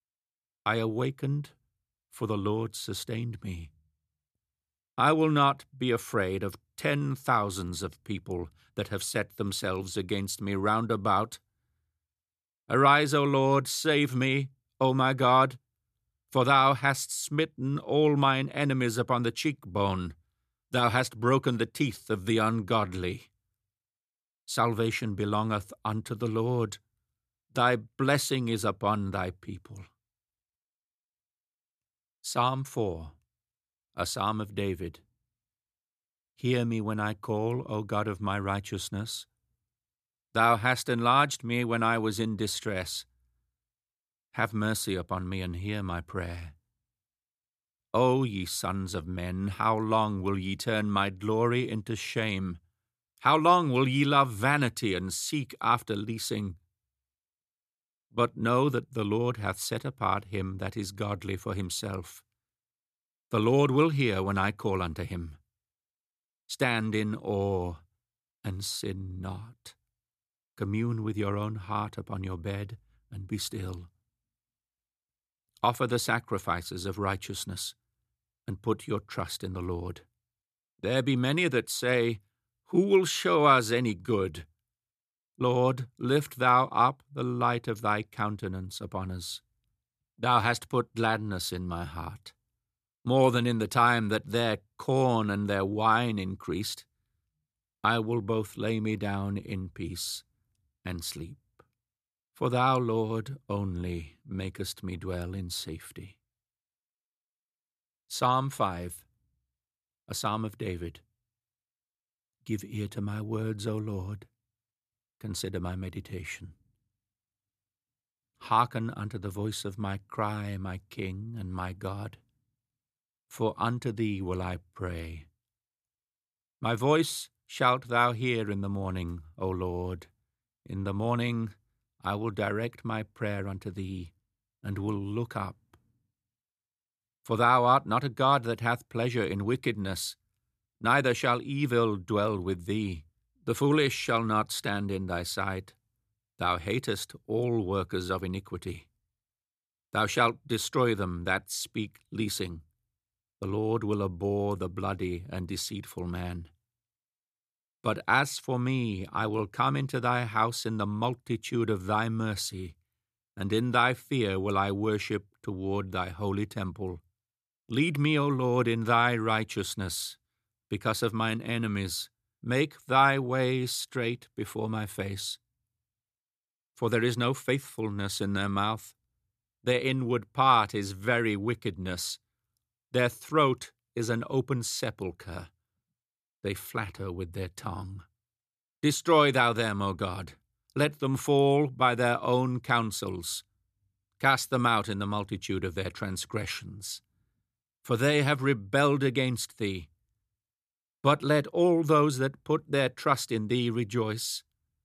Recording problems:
none

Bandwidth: 14.5 kHz